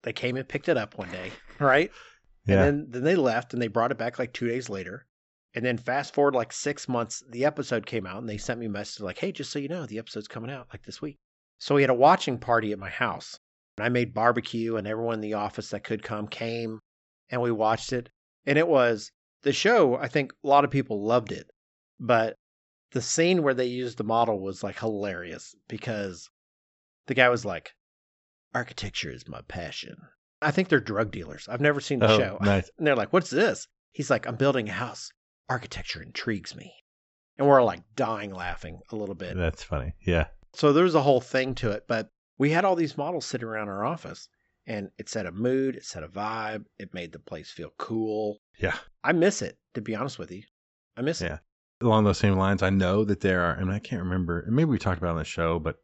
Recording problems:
high frequencies cut off; noticeable; nothing above 8 kHz

